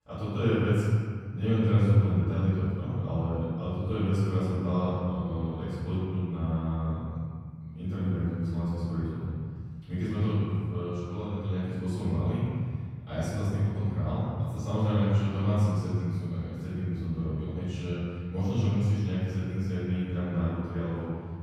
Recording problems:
room echo; strong; dies away in 1.9 s
off-mic speech; far

